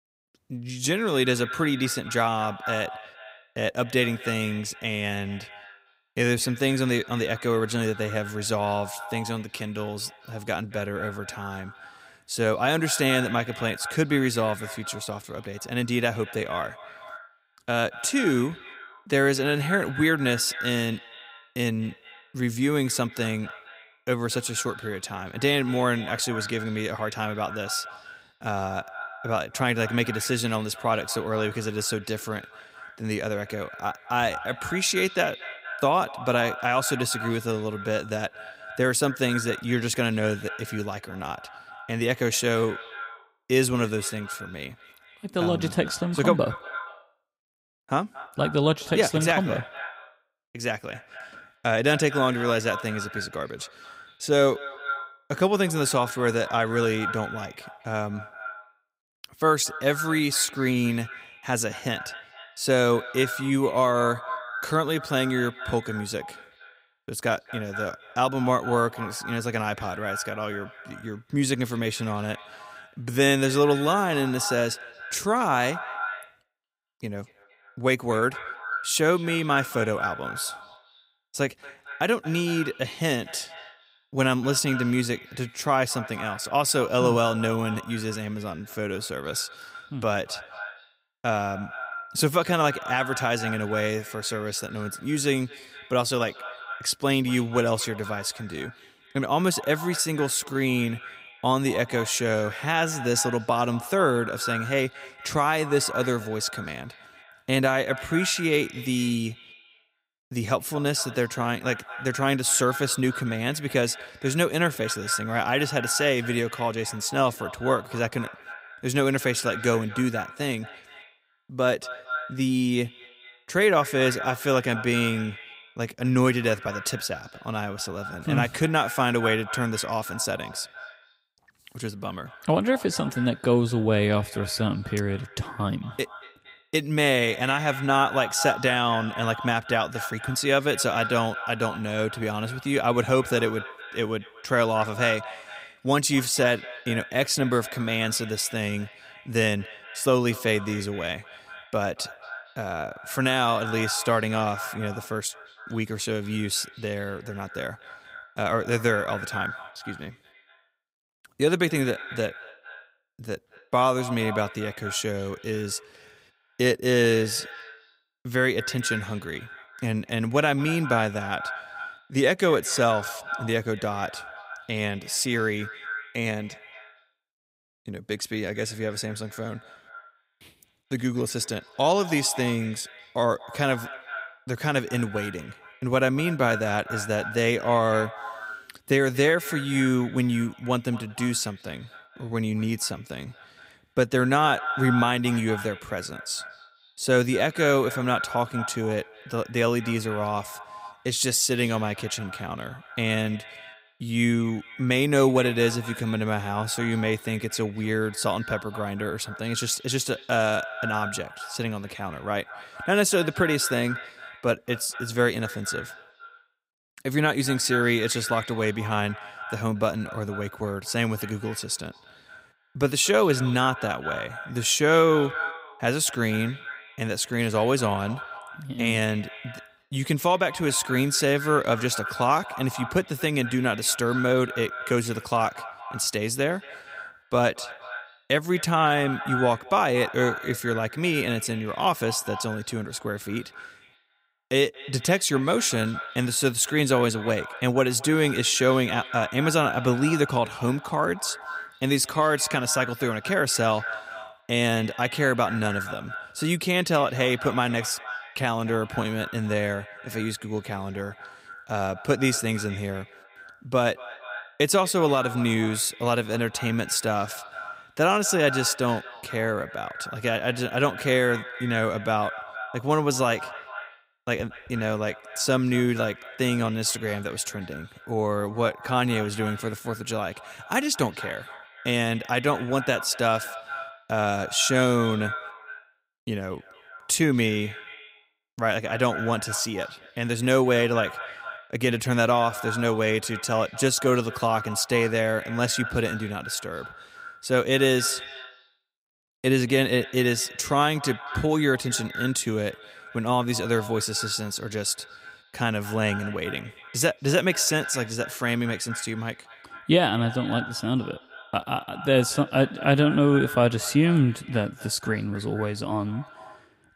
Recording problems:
echo of what is said; noticeable; throughout; 230 ms later, 10 dB below the speech

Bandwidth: 15.5 kHz